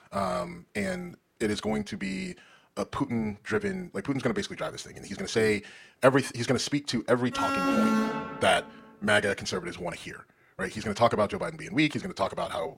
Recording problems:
wrong speed, natural pitch; too fast; 1.6 times normal speed
alarm; loud; from 7.5 to 8.5 s; peak 5 dB above the speech

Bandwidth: 16.5 kHz